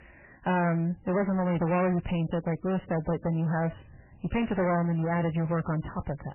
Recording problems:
distortion; heavy; 7 dB below the speech
garbled, watery; badly; nothing above 3 kHz

